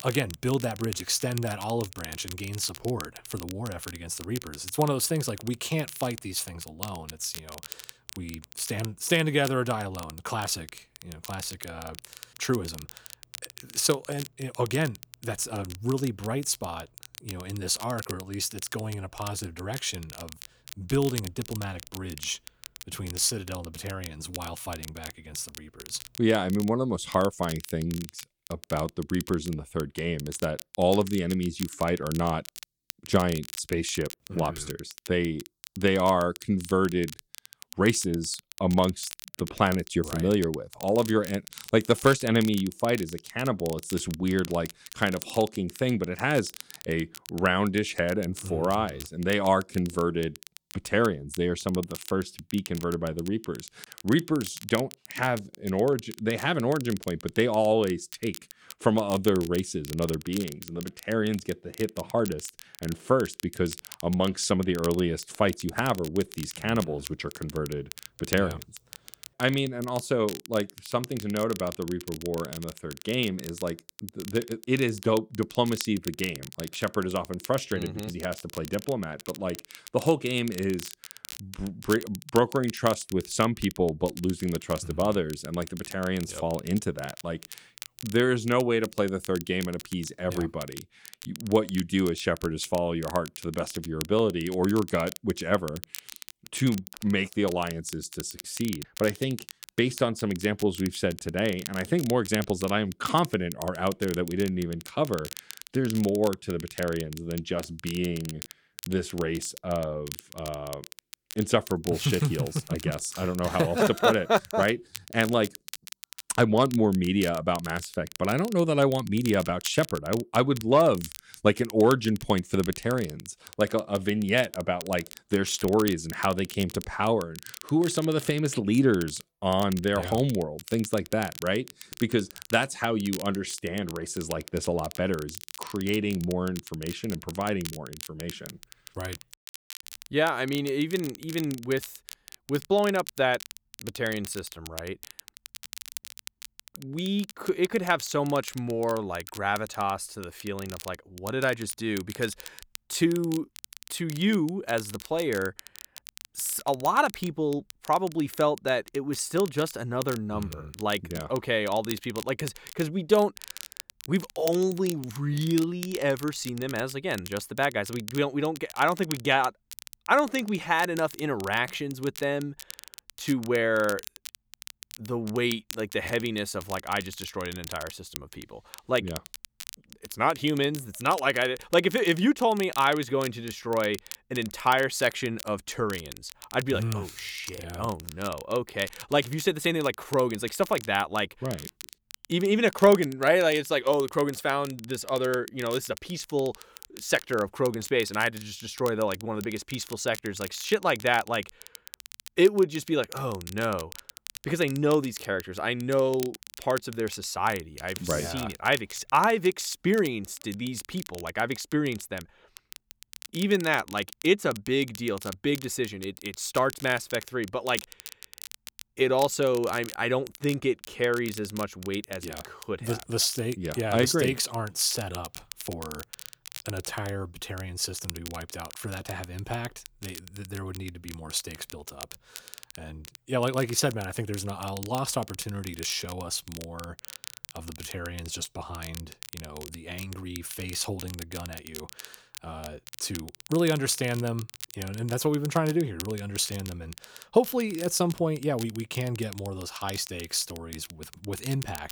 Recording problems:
crackle, like an old record; noticeable; 15 dB below the speech

